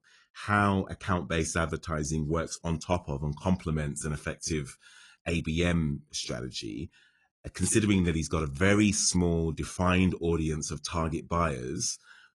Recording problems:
garbled, watery; slightly; nothing above 10 kHz

